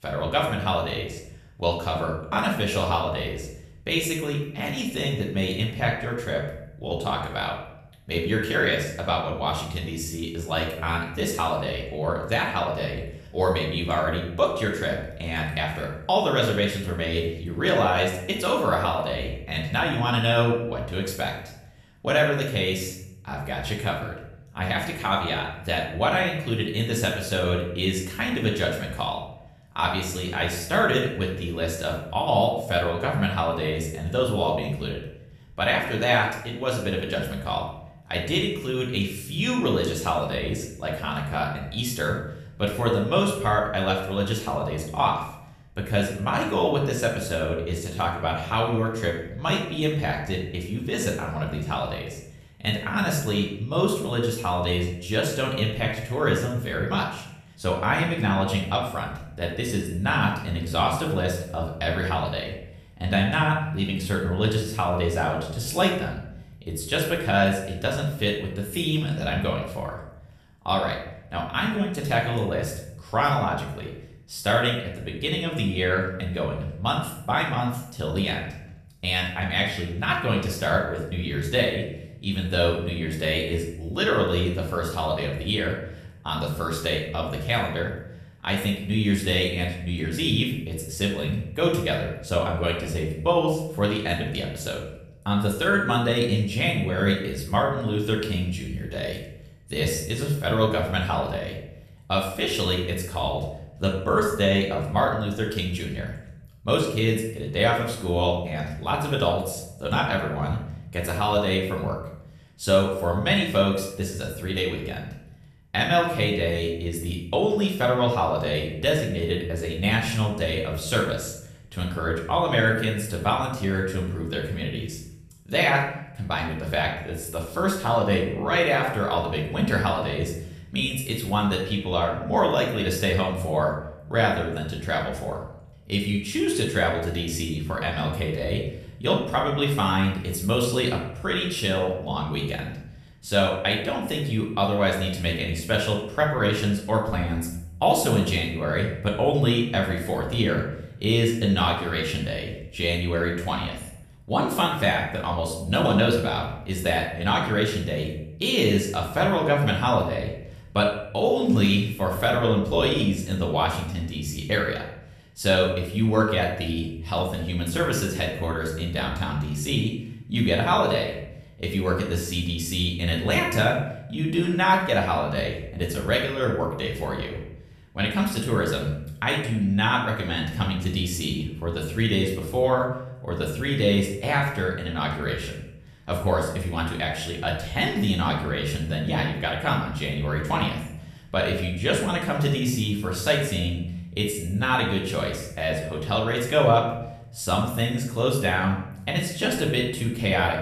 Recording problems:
off-mic speech; far
room echo; noticeable; dies away in 0.7 s

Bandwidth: 14 kHz